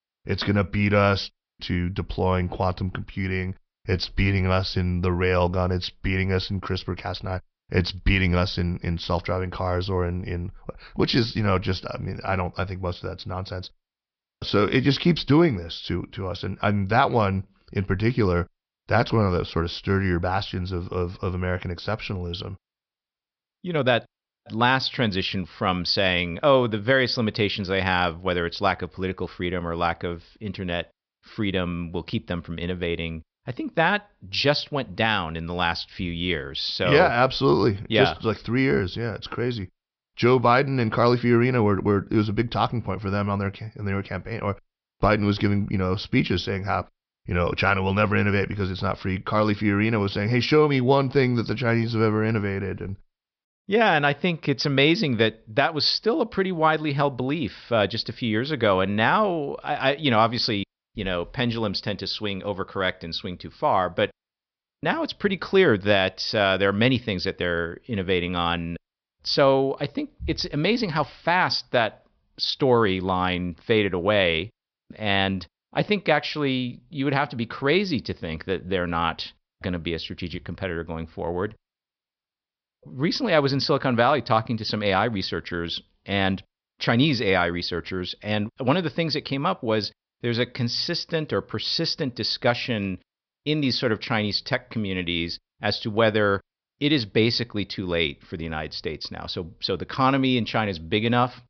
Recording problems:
high frequencies cut off; noticeable; nothing above 5.5 kHz

